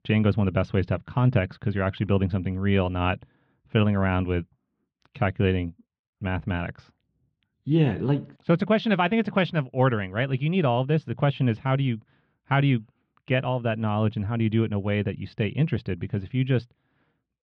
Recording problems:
muffled; slightly; fading above 3 kHz

